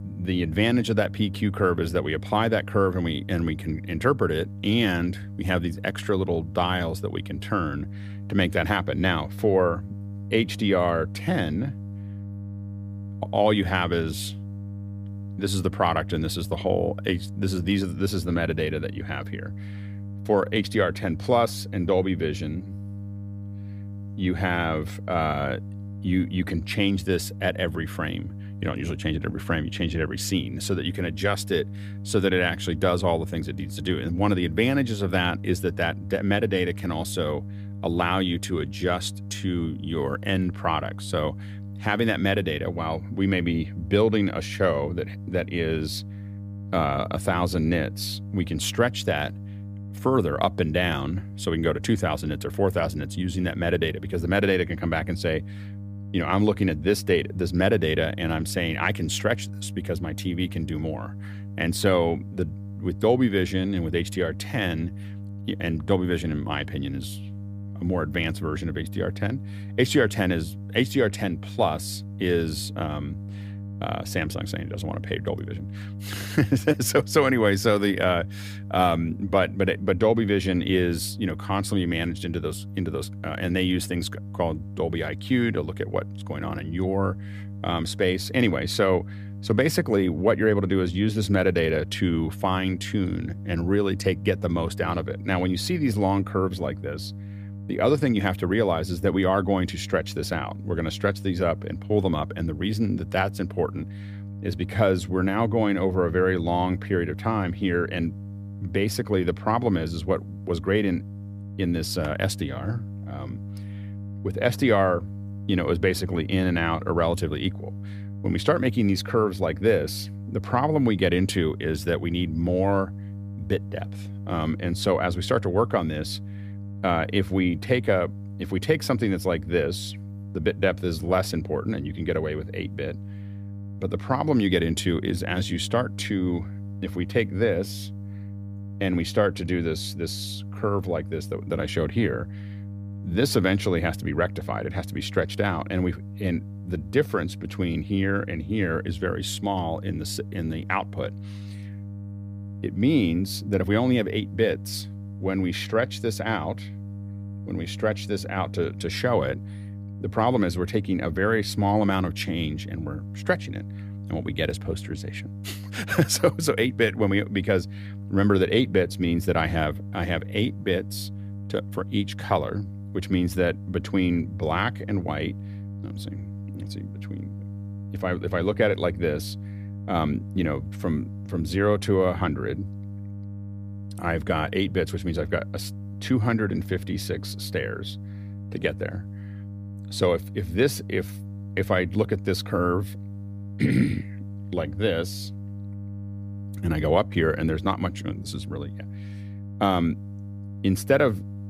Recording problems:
electrical hum; faint; throughout; 50 Hz, 20 dB below the speech

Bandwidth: 15 kHz